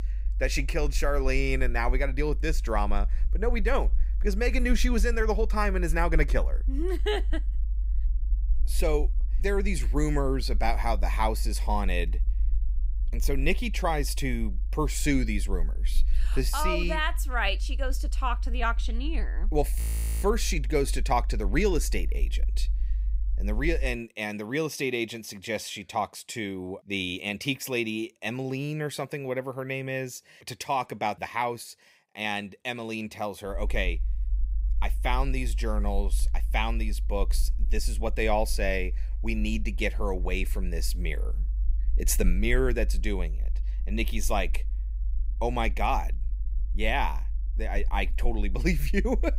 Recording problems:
low rumble; faint; until 24 s and from 34 s on; 25 dB below the speech
audio freezing; at 20 s

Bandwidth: 15.5 kHz